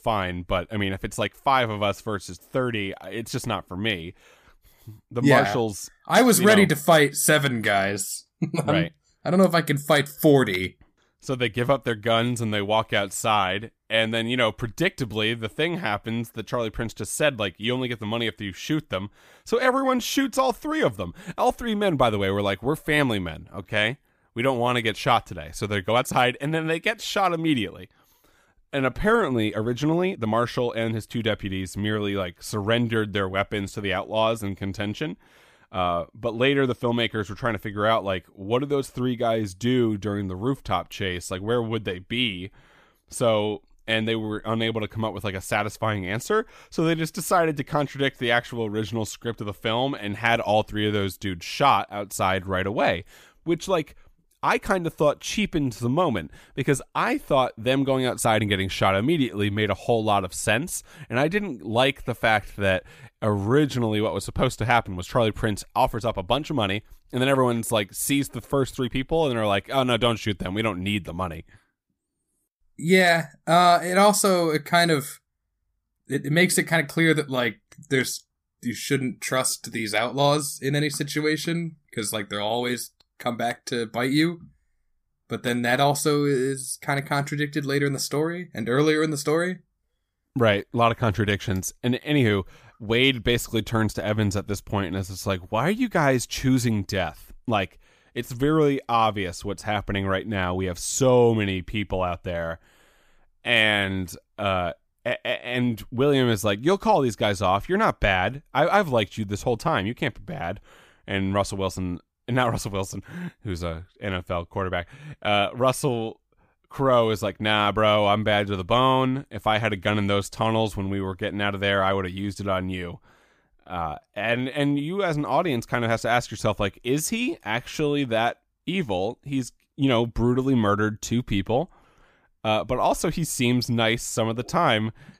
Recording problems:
uneven, jittery; strongly; from 0.5 s to 2:05

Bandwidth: 15 kHz